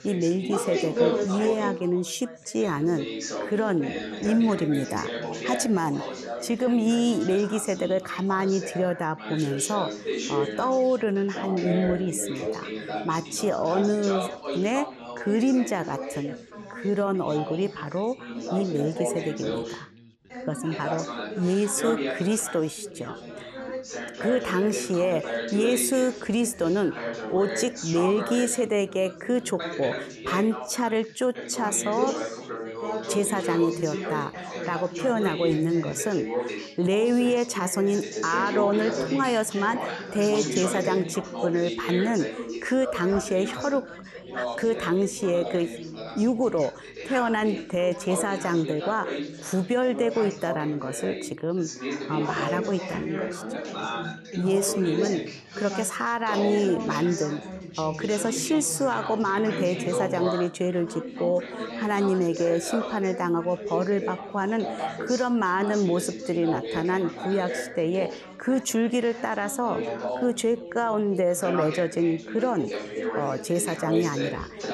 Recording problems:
background chatter; loud; throughout; 4 voices, 7 dB below the speech

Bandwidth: 13 kHz